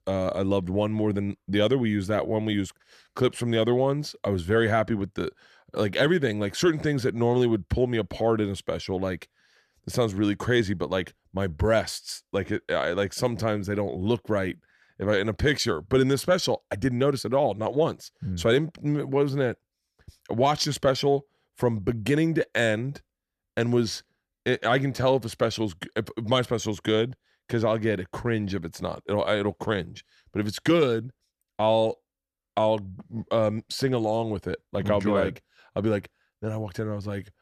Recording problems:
none

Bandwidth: 14 kHz